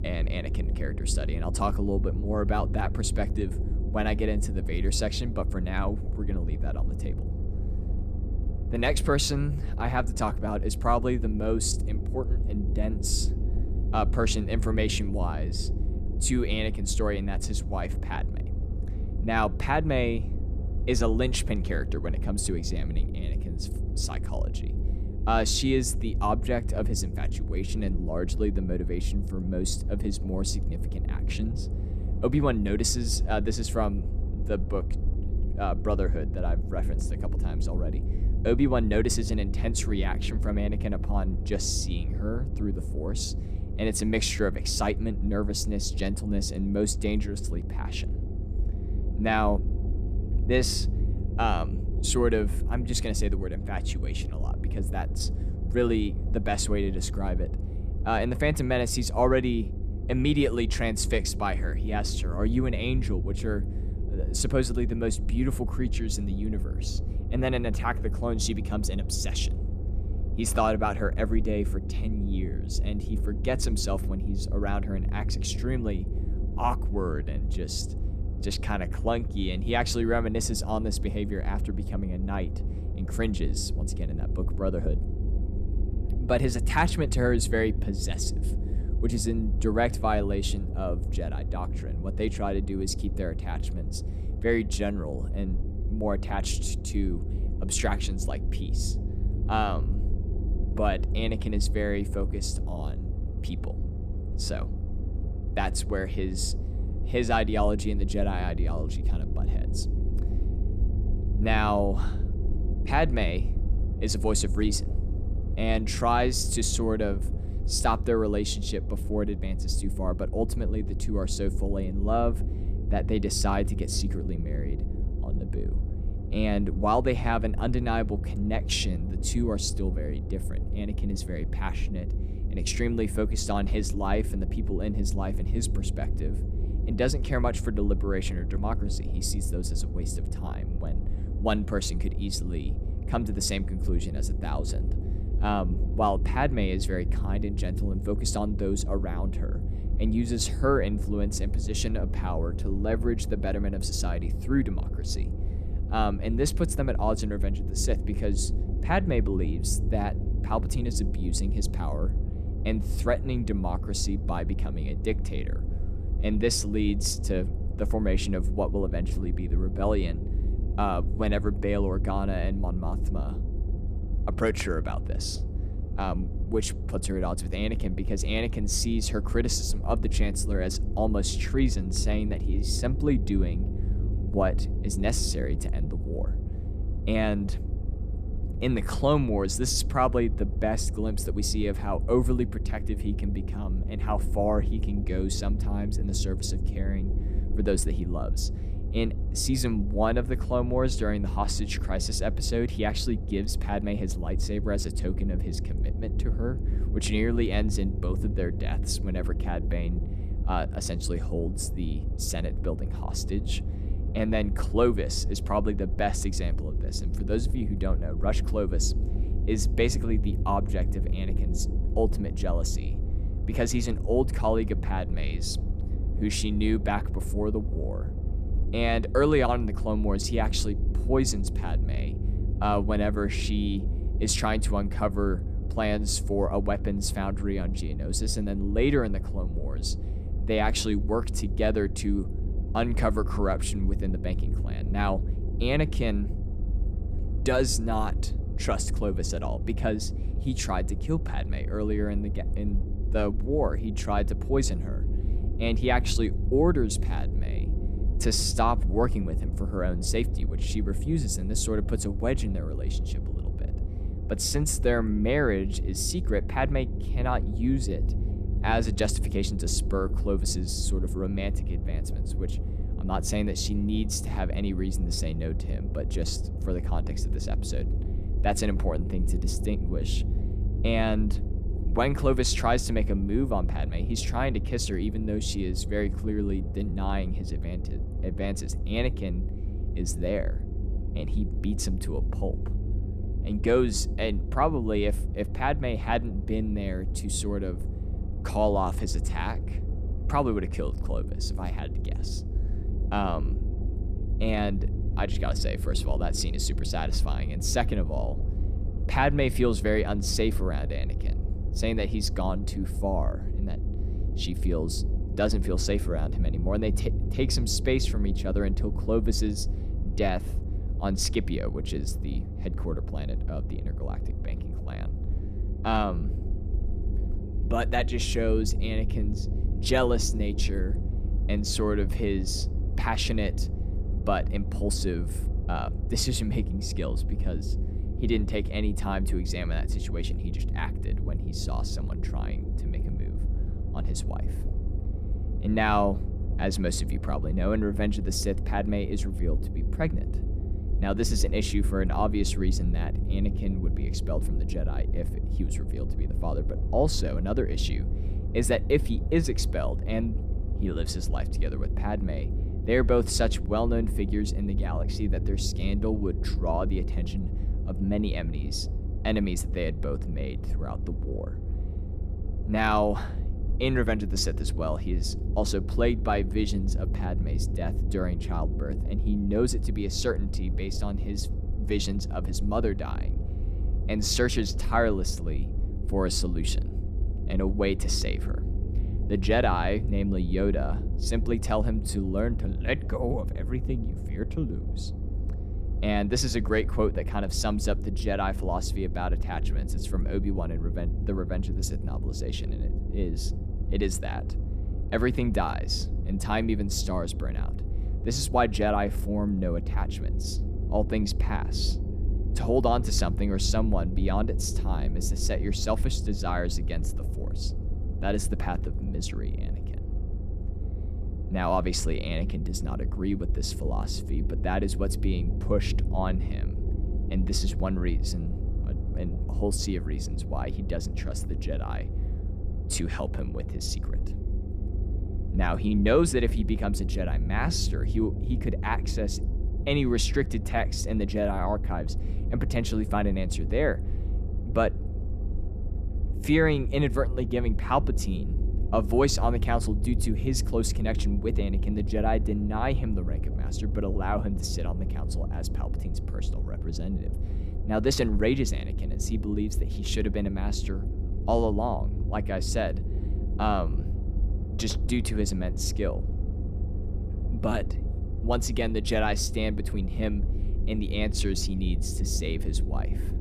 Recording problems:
low rumble; noticeable; throughout; 15 dB below the speech

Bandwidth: 14.5 kHz